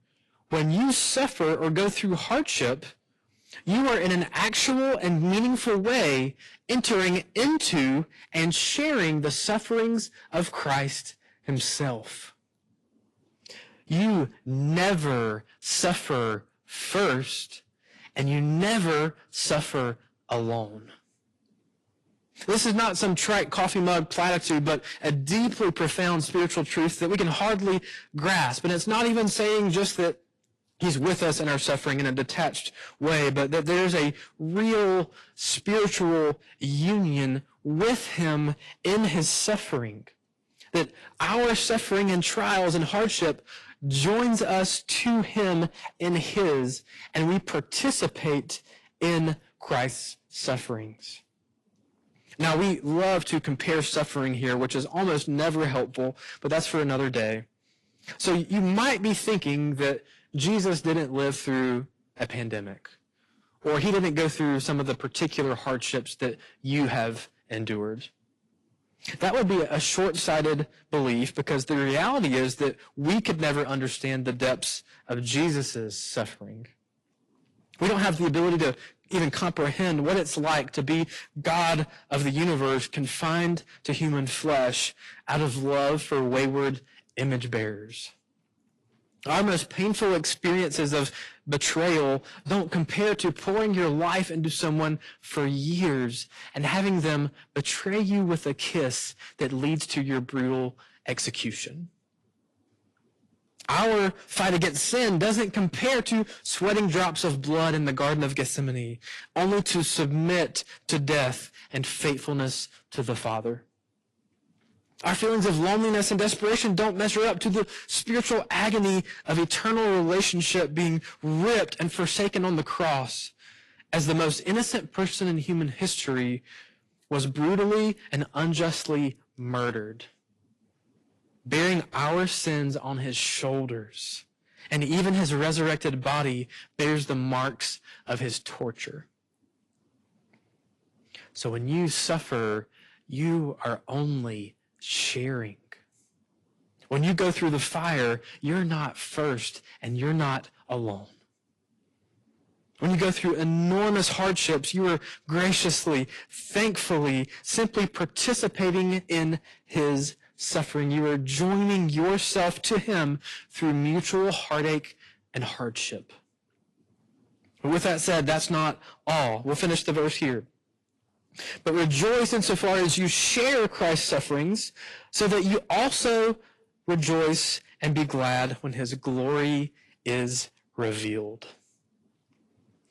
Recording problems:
distortion; heavy; 14% of the sound clipped
garbled, watery; slightly; nothing above 11 kHz

